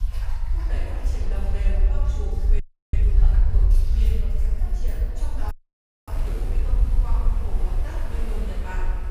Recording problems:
room echo; strong; dies away in 1.8 s
off-mic speech; far
rain or running water; loud; throughout; 5 dB below the speech
low rumble; loud; throughout; 7 dB below the speech
audio freezing; at 2.5 s and at 5.5 s for 0.5 s

